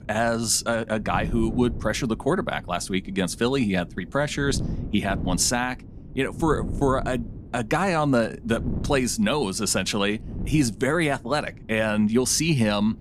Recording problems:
wind noise on the microphone; occasional gusts; 20 dB below the speech

